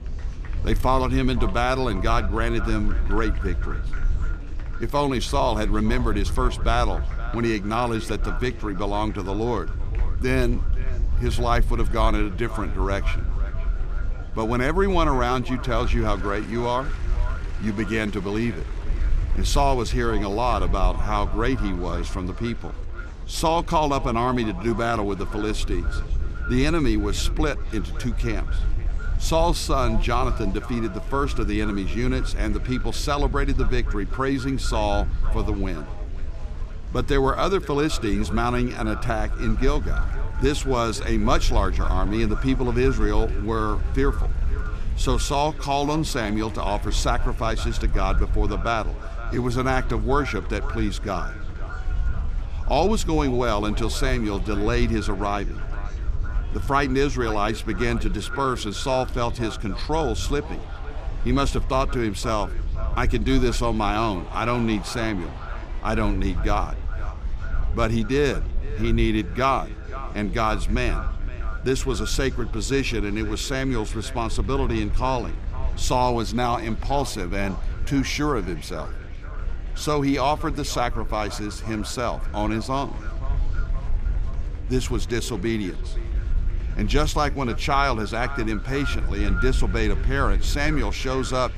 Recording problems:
echo of what is said; noticeable; throughout; 520 ms later, 15 dB below the speech
wind noise on the microphone; occasional gusts; 25 dB below the speech
murmuring crowd; faint; throughout; 20 dB below the speech

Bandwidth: 15 kHz